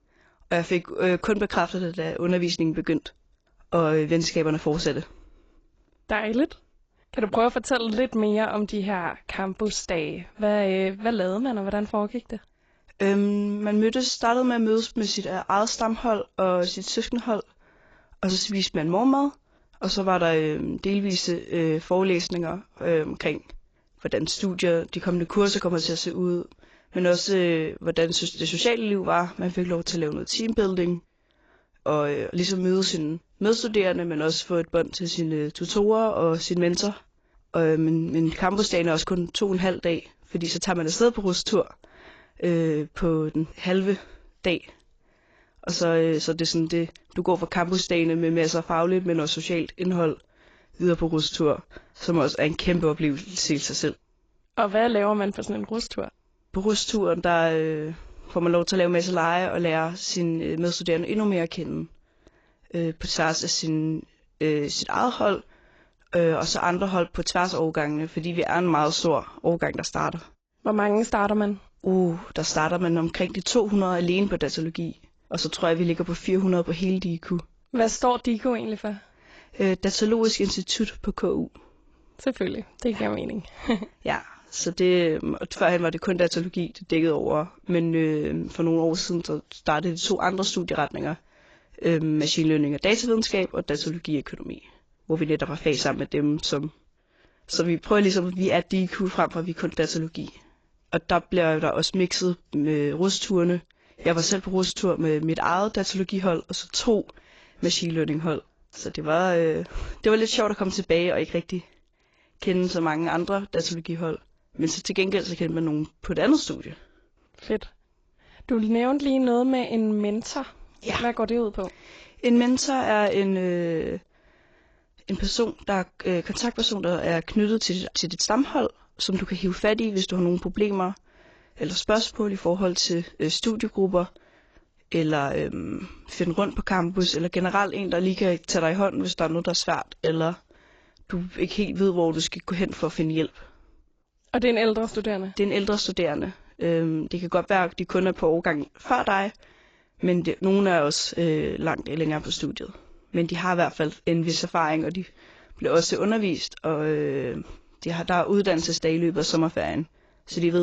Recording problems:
garbled, watery; badly; nothing above 7.5 kHz
abrupt cut into speech; at the end

